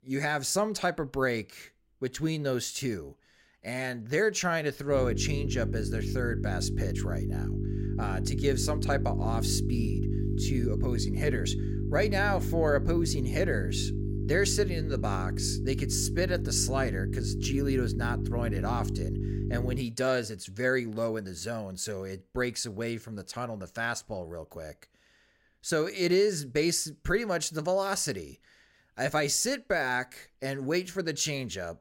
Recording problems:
electrical hum; loud; from 5 to 20 s; 50 Hz, 9 dB below the speech

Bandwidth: 16 kHz